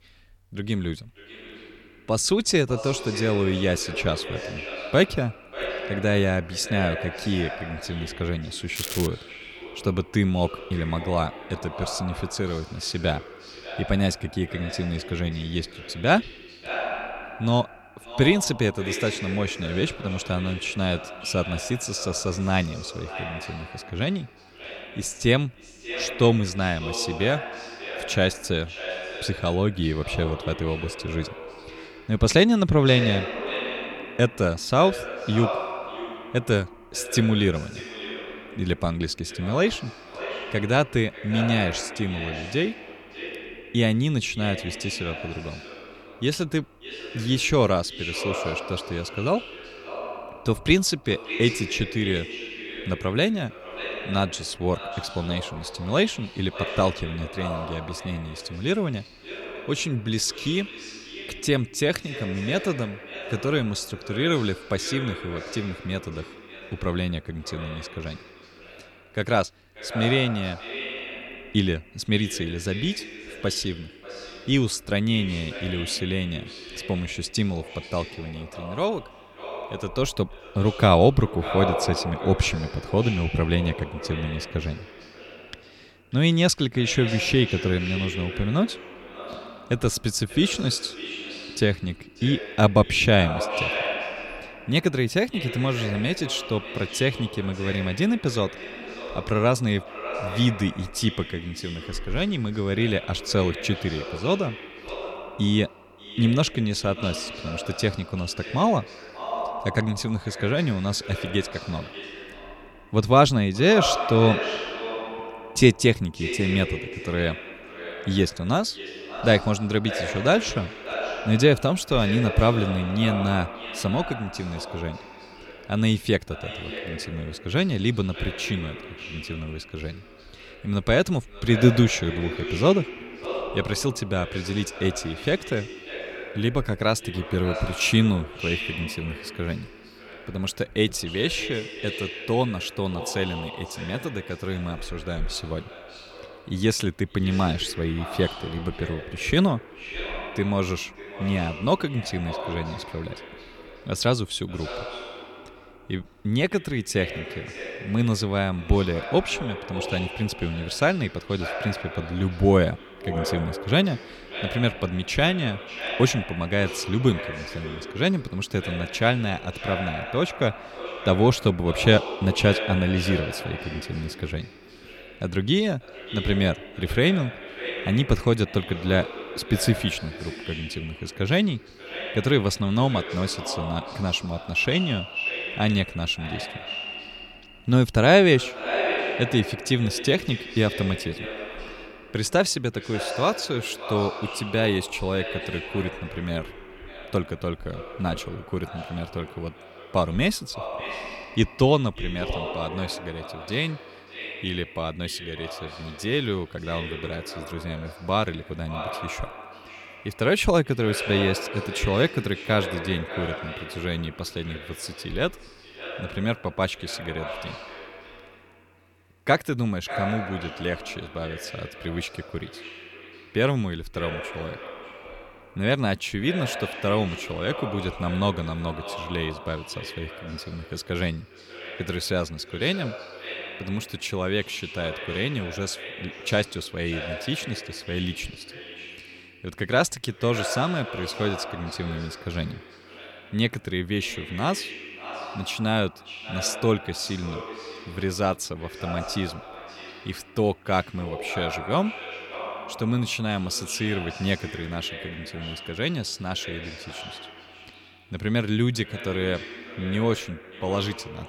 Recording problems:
echo of what is said; strong; throughout; 590 ms later, 10 dB below the speech
crackling; loud; at 9 s; 7 dB below the speech

